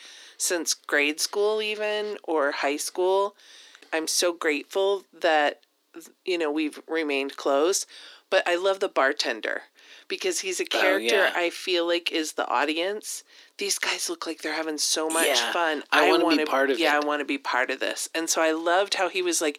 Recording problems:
thin; somewhat; fading below 300 Hz

